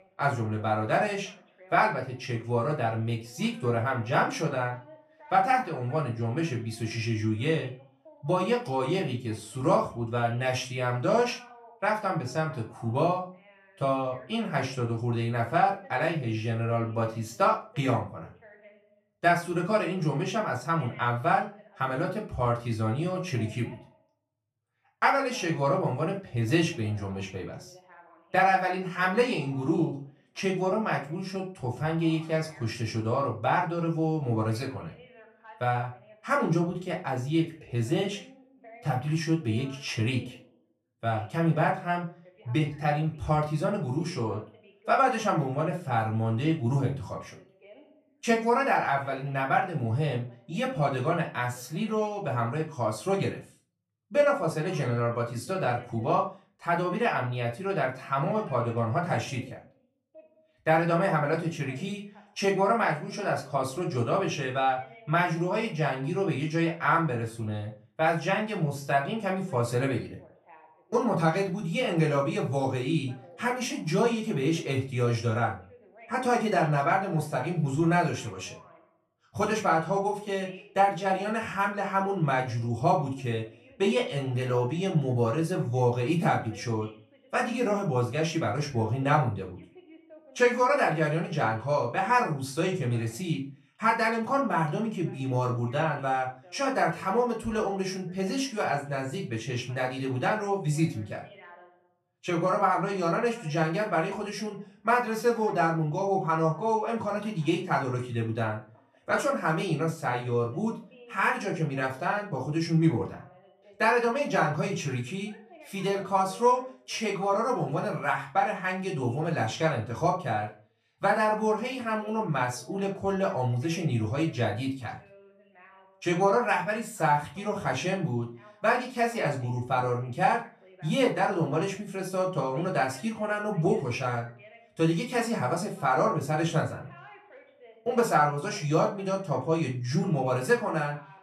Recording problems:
off-mic speech; far
room echo; slight; dies away in 0.3 s
voice in the background; faint; throughout; 25 dB below the speech

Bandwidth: 14 kHz